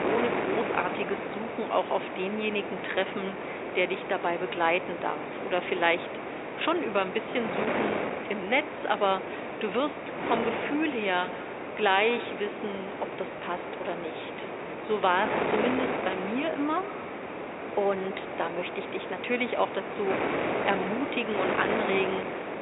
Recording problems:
high frequencies cut off; severe; nothing above 4 kHz
echo of what is said; noticeable; from 10 s on; 150 ms later, 15 dB below the speech
thin; somewhat; fading below 450 Hz
wind noise on the microphone; heavy; 4 dB below the speech

